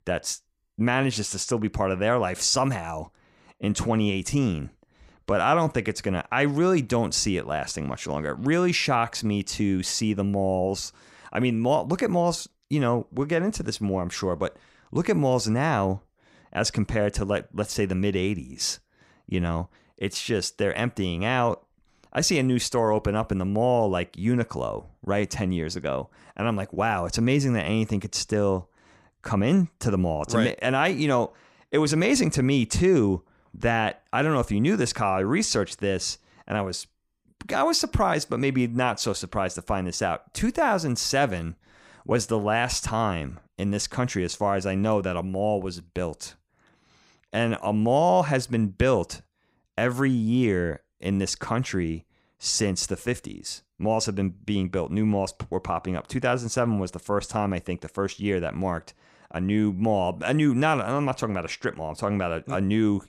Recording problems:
none

